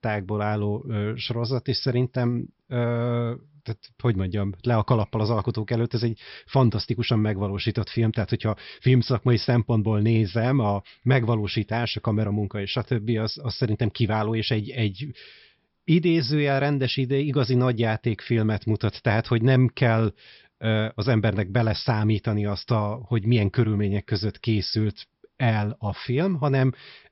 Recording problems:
high frequencies cut off; noticeable; nothing above 5.5 kHz

